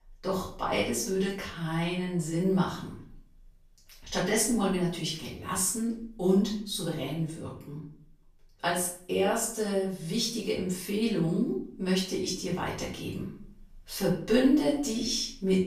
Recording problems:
off-mic speech; far
room echo; noticeable; dies away in 0.5 s

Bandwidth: 14.5 kHz